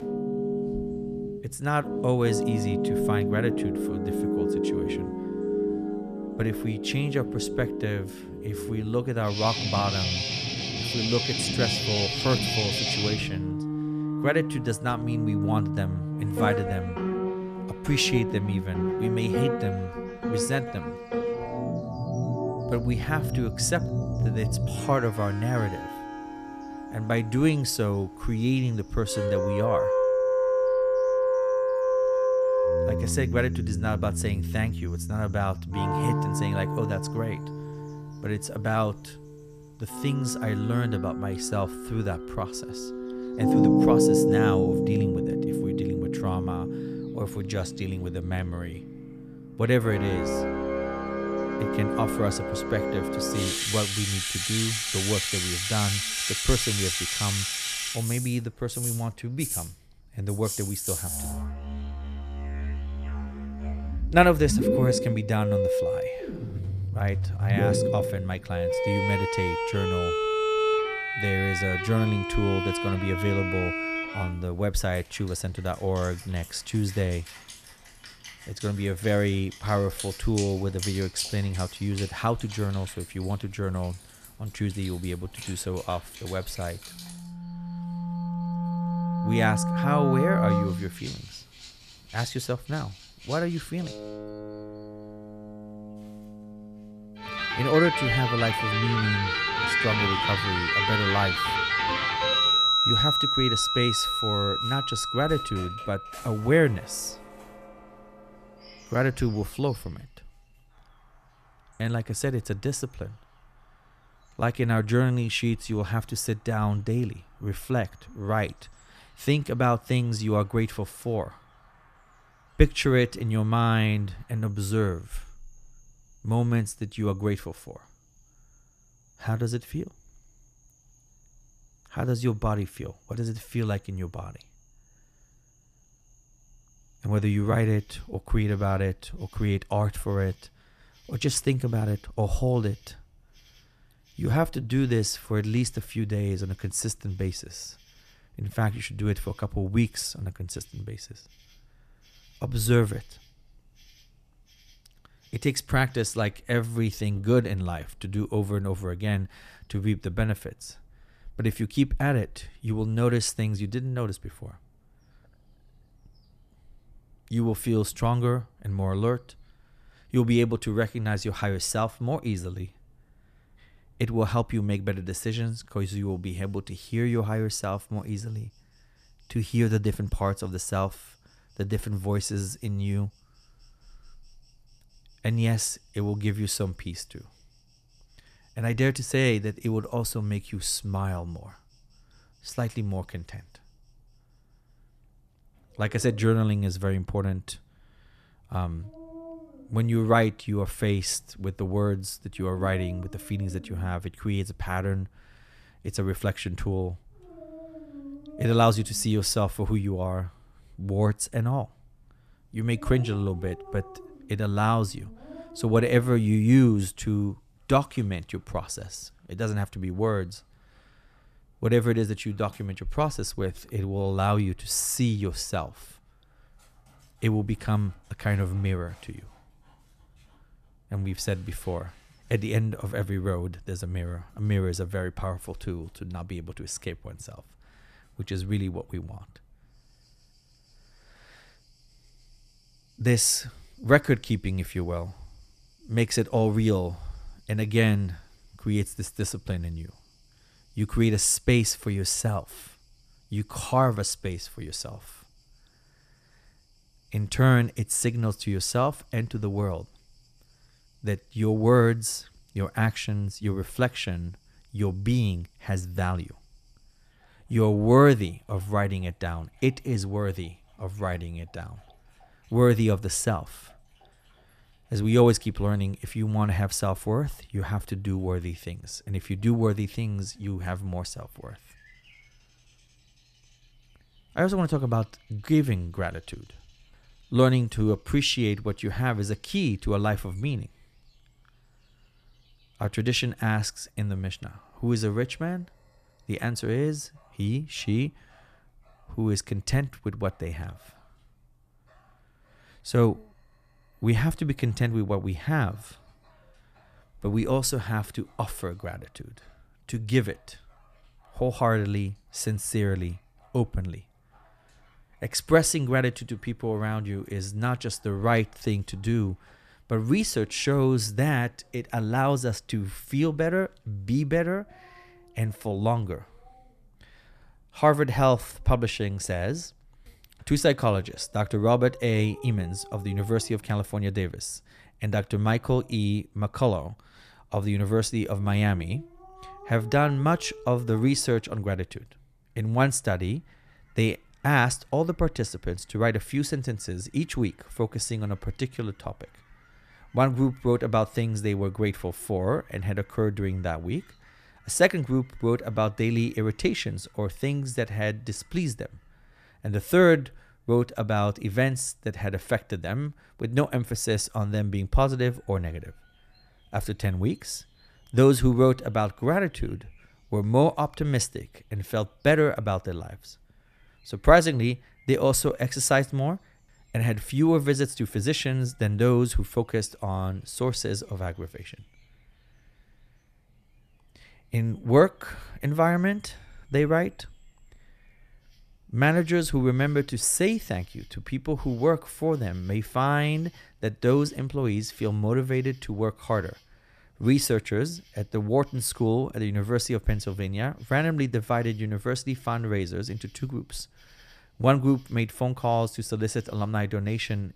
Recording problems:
background music; loud; until 1:50; as loud as the speech
animal sounds; faint; throughout; 30 dB below the speech

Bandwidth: 14.5 kHz